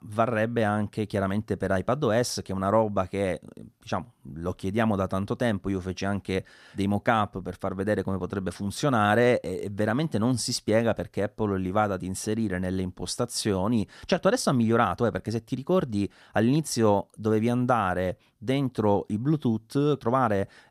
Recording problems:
none

